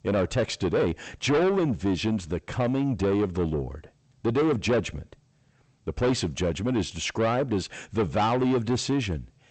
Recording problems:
distortion; heavy; 7 dB below the speech
garbled, watery; slightly; nothing above 8 kHz

